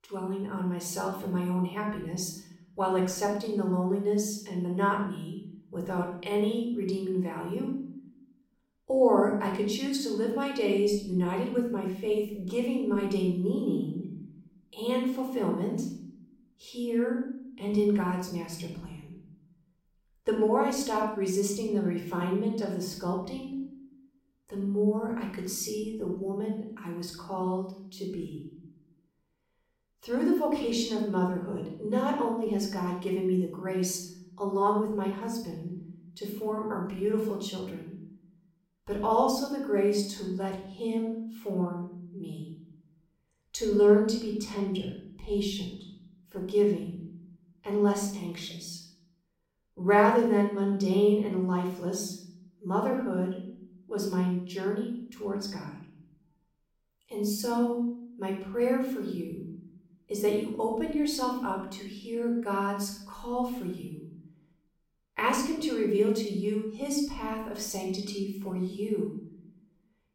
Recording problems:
room echo; noticeable; dies away in 0.7 s
off-mic speech; somewhat distant

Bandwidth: 16.5 kHz